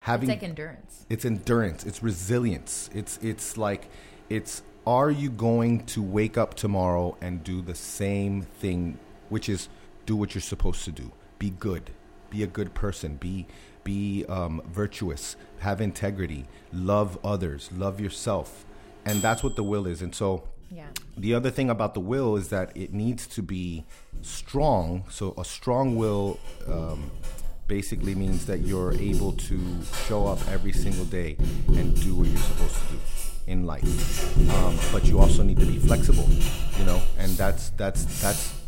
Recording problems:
household noises; very loud; throughout; as loud as the speech

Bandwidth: 16 kHz